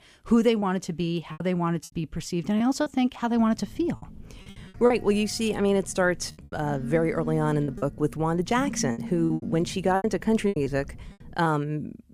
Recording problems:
choppy; very; 9% of the speech affected
phone ringing; noticeable; from 3.5 to 11 s; peak 7 dB below the speech

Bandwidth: 15 kHz